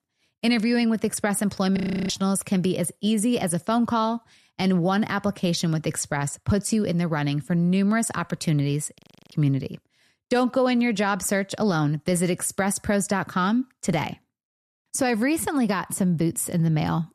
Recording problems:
audio freezing; at 2 s and at 9 s

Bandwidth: 13.5 kHz